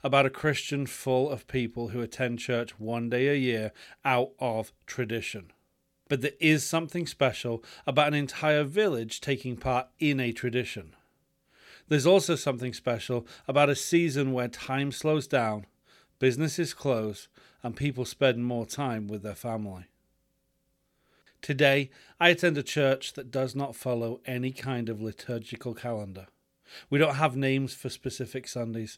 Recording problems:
none

